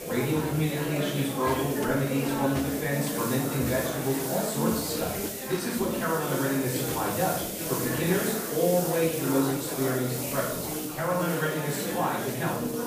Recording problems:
off-mic speech; far
room echo; noticeable; dies away in 0.7 s
murmuring crowd; loud; throughout; 5 dB below the speech
hiss; loud; throughout; 6 dB below the speech

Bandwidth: 15 kHz